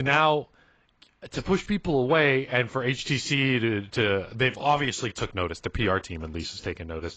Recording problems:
garbled, watery; badly; nothing above 7.5 kHz
abrupt cut into speech; at the start

